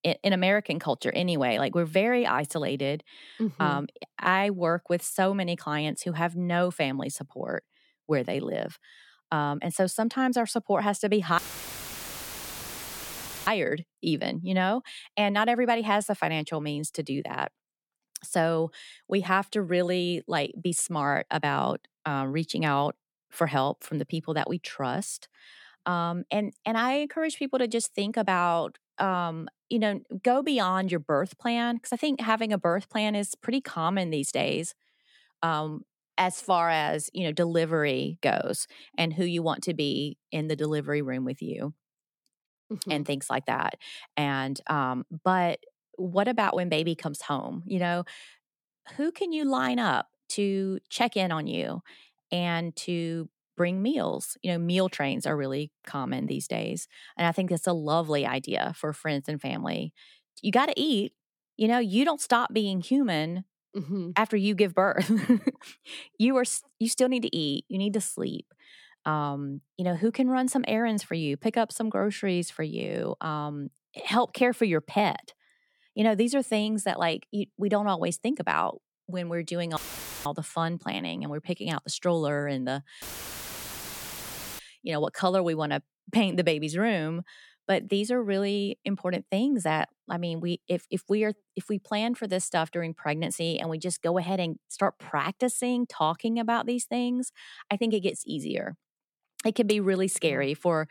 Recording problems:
audio cutting out; filled with static; at 11 s for 2 s, at 1:20 and at 1:23 for 1.5 s

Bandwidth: 17 kHz